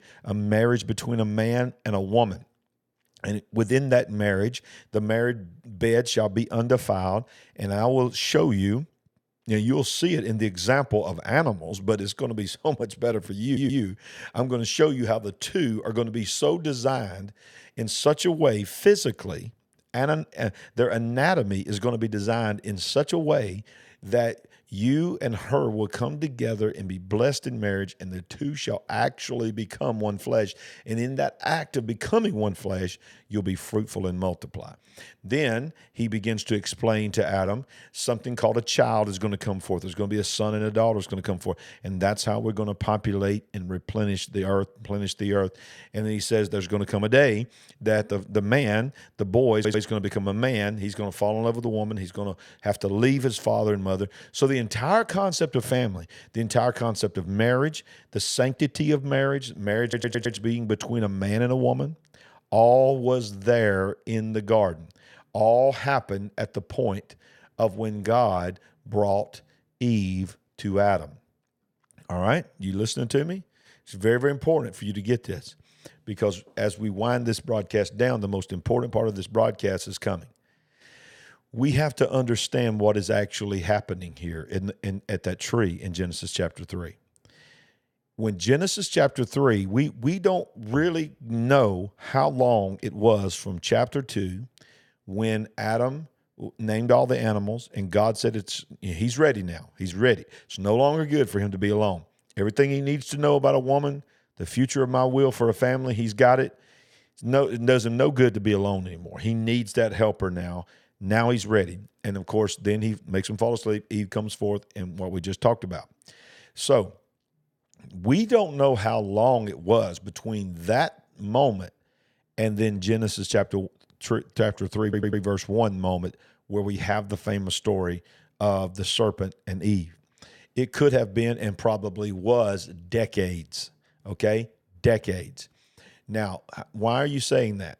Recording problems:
audio stuttering; 4 times, first at 13 s

